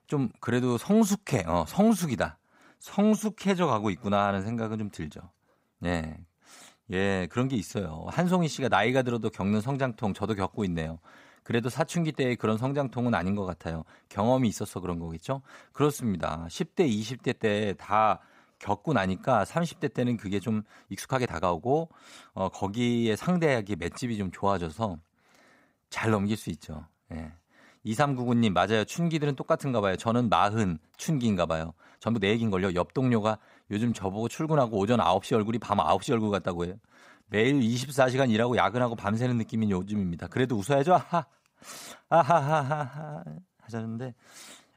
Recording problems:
uneven, jittery; strongly; from 3 to 42 s

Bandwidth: 15.5 kHz